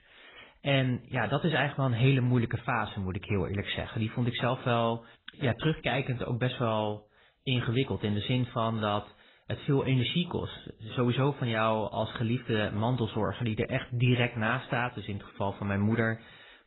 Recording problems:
garbled, watery; badly; nothing above 4 kHz

